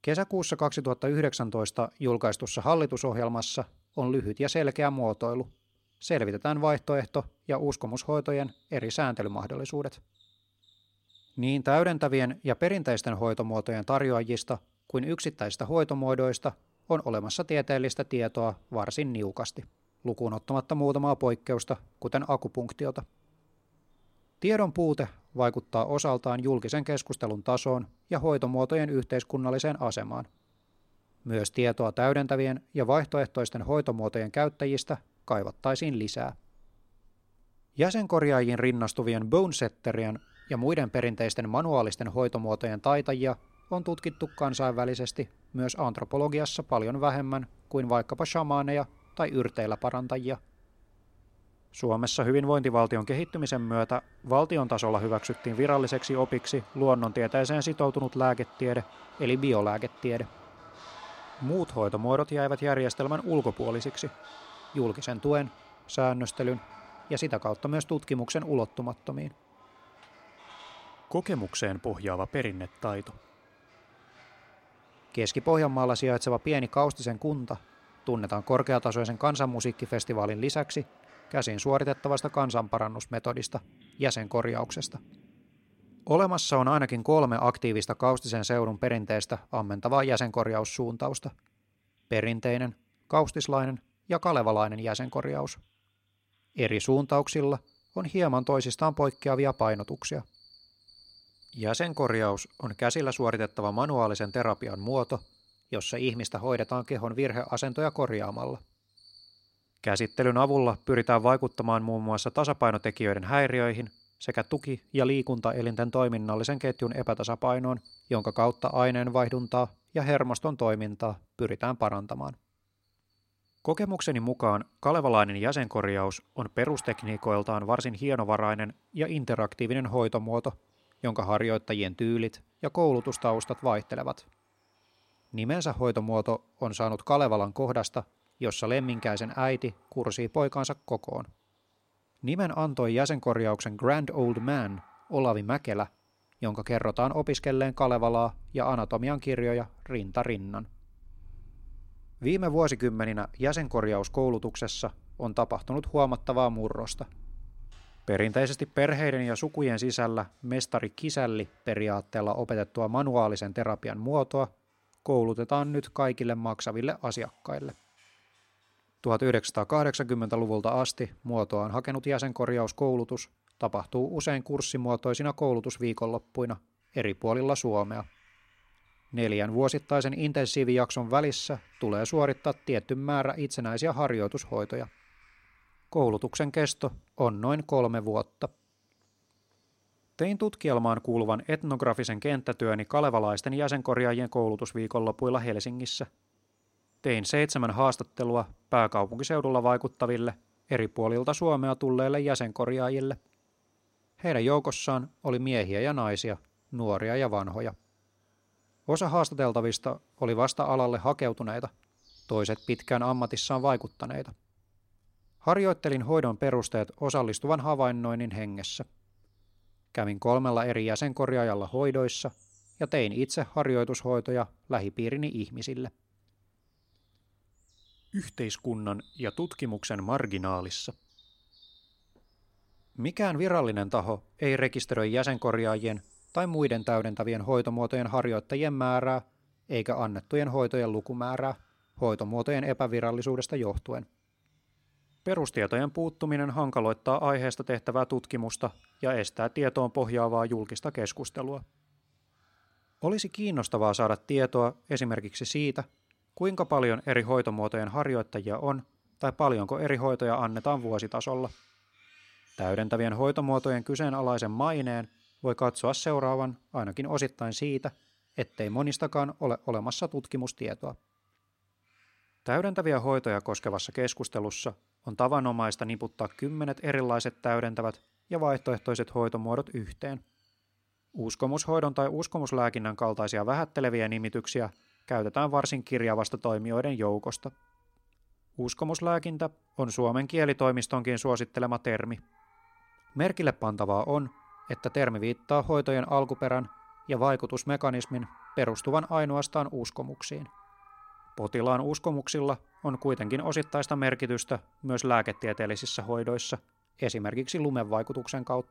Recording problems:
animal sounds; faint; throughout; 25 dB below the speech

